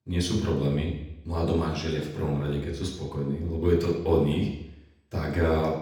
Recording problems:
off-mic speech; far
room echo; noticeable; dies away in 0.8 s

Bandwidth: 19 kHz